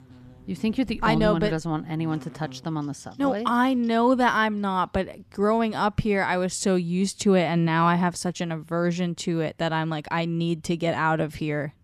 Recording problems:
electrical hum; faint; throughout; 50 Hz, 30 dB below the speech

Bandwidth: 14.5 kHz